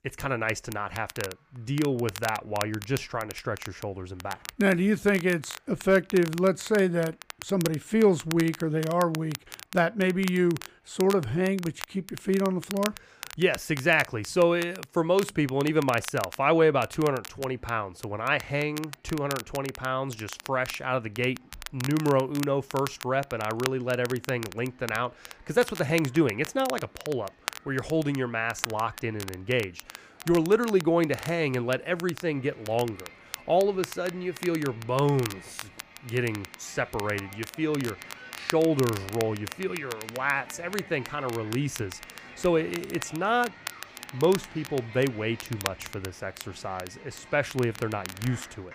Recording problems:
crackle, like an old record; noticeable; 15 dB below the speech
crowd noise; faint; throughout; 20 dB below the speech

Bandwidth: 15 kHz